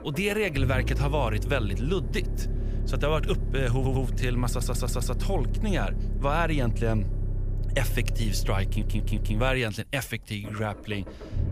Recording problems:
low rumble; noticeable; throughout; 15 dB below the speech
audio stuttering; at 4 s, at 4.5 s and at 8.5 s

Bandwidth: 15 kHz